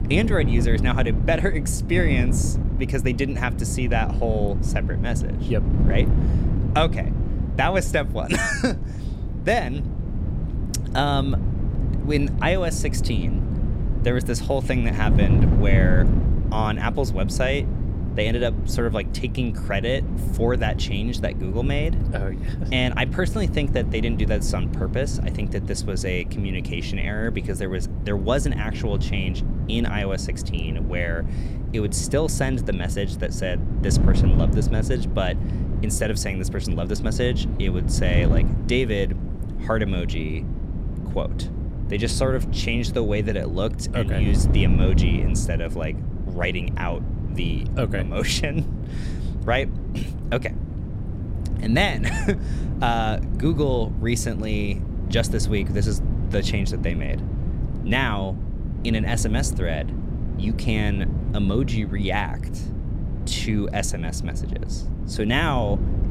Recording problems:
wind noise on the microphone; heavy; 10 dB below the speech

